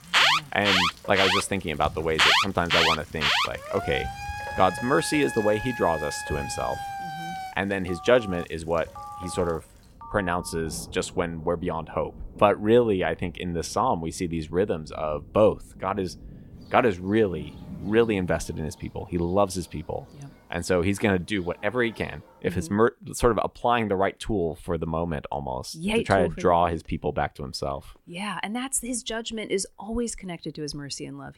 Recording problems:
alarms or sirens; very loud; until 10 s; 1 dB above the speech
rain or running water; noticeable; until 22 s; 20 dB below the speech

